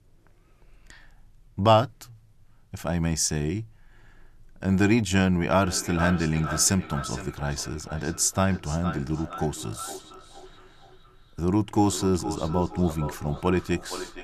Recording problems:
echo of what is said; noticeable; from 5.5 s on; 460 ms later, 15 dB below the speech

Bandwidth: 13.5 kHz